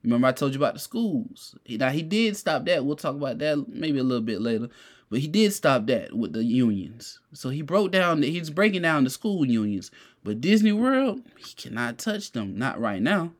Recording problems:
none

